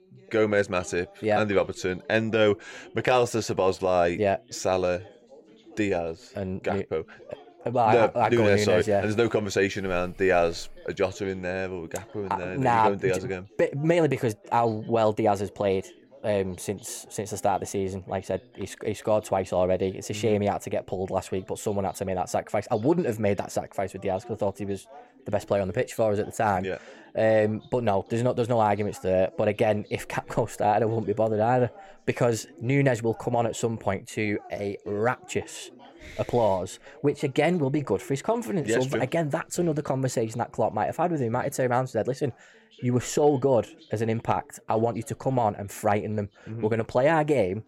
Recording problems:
background chatter; faint; throughout; 2 voices, 25 dB below the speech

